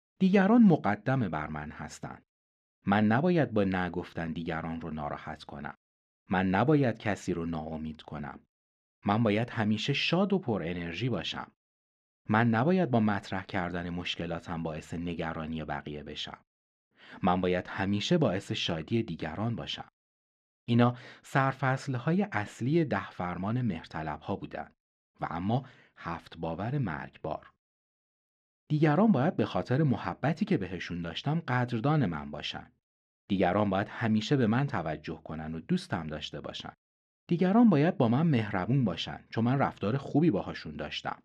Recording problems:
muffled; slightly; fading above 3 kHz

